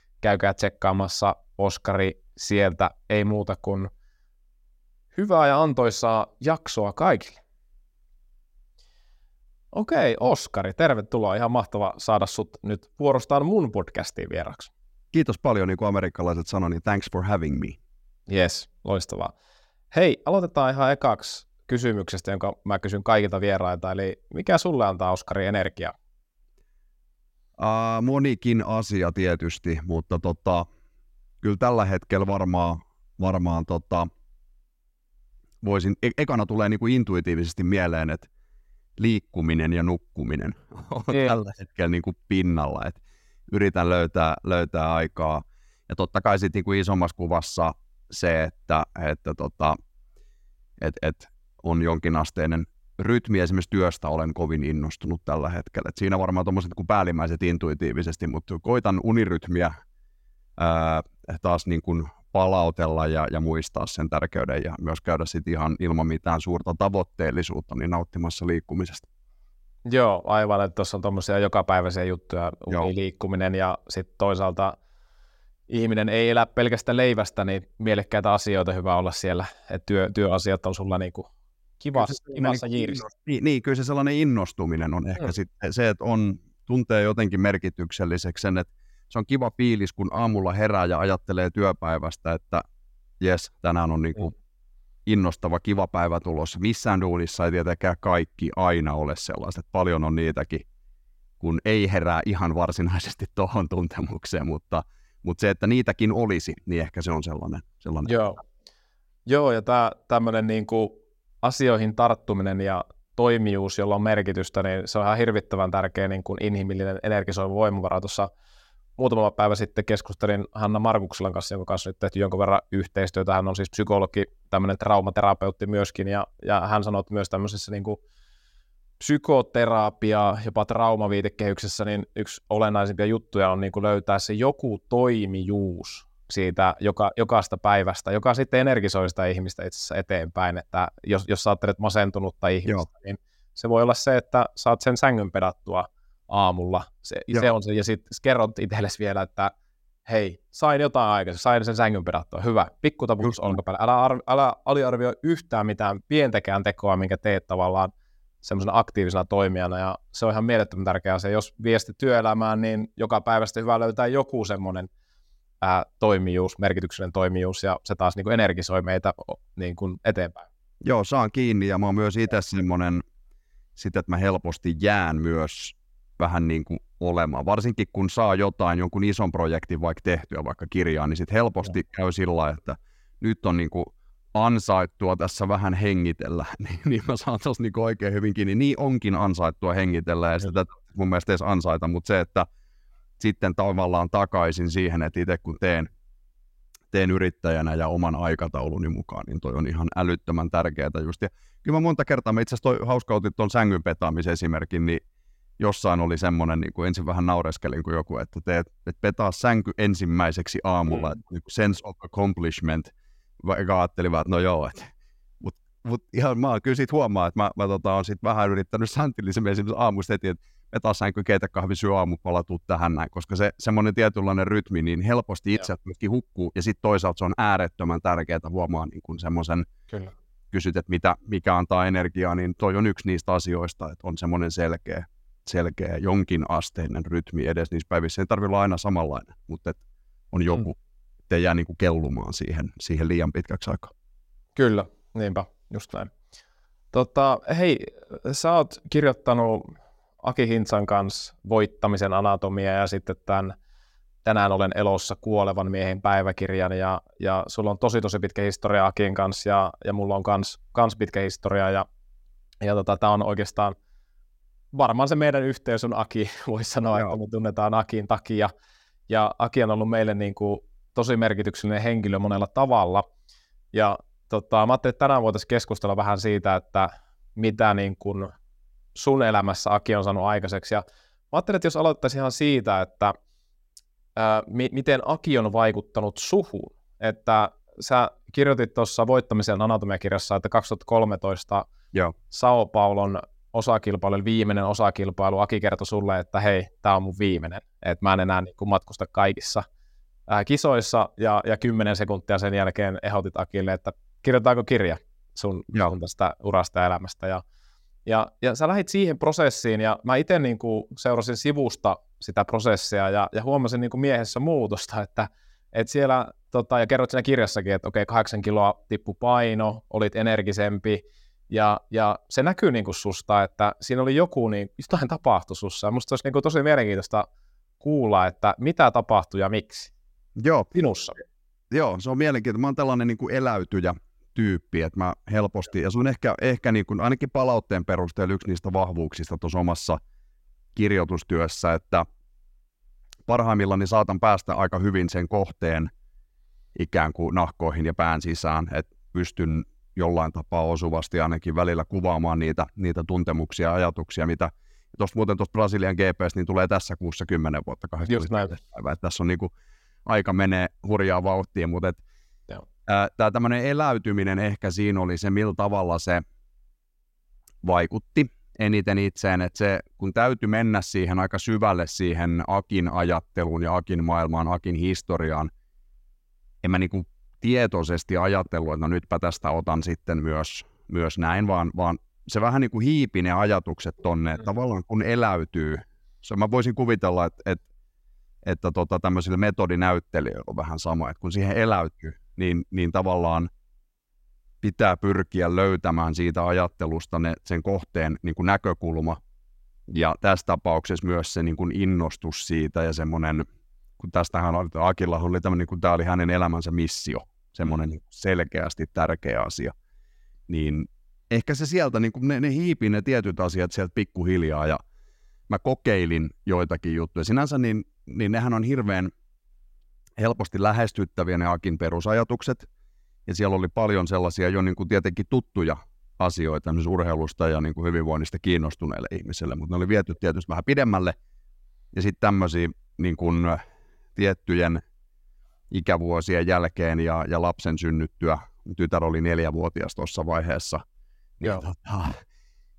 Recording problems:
none

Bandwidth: 16 kHz